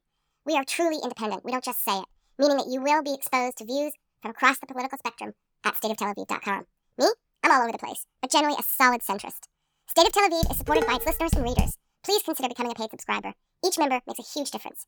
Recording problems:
wrong speed and pitch; too fast and too high; 1.6 times normal speed
clattering dishes; noticeable; from 10 to 12 s; peak 1 dB below the speech

